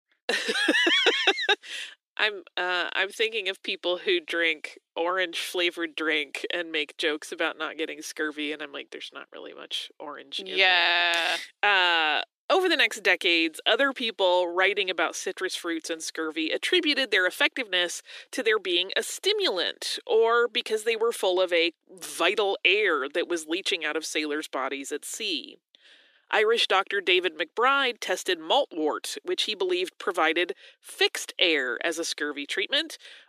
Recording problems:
thin; somewhat; fading below 300 Hz

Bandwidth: 14.5 kHz